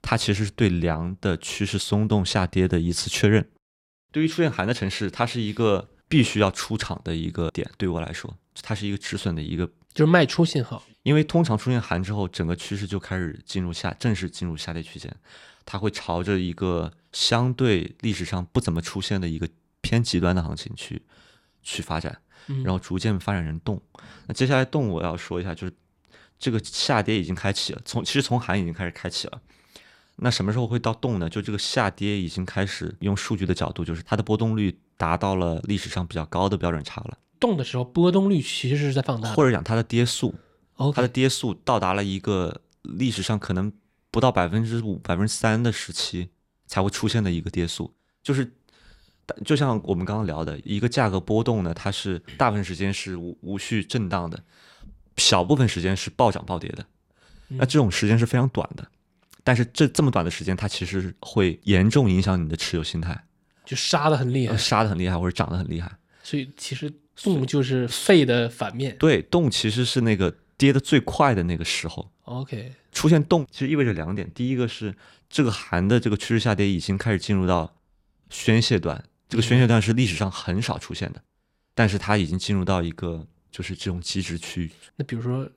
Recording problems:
none

